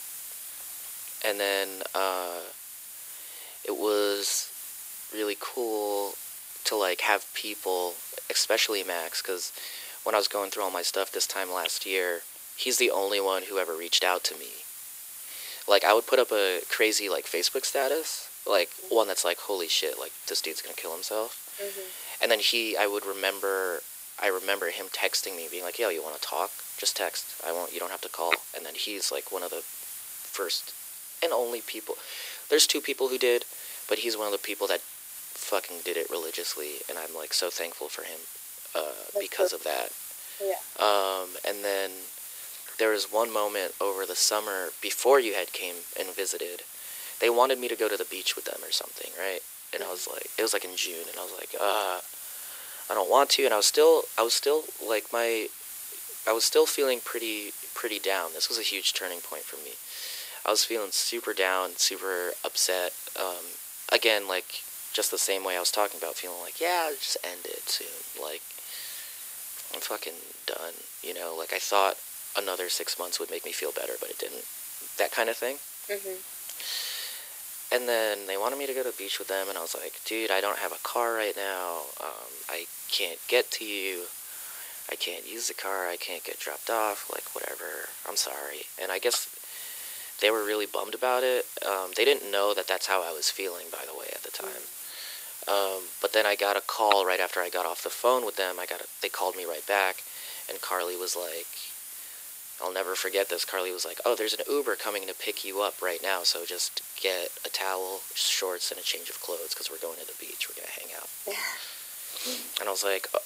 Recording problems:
thin; very; fading below 350 Hz
hiss; loud; throughout; 10 dB below the speech

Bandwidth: 15.5 kHz